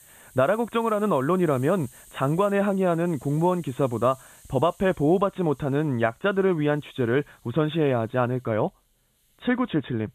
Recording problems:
high frequencies cut off; severe; nothing above 4 kHz
hiss; faint; throughout; 25 dB below the speech

